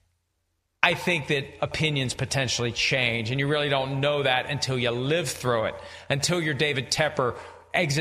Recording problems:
squashed, flat; heavily
echo of what is said; noticeable; throughout; 90 ms later, 20 dB below the speech
abrupt cut into speech; at the end

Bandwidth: 14.5 kHz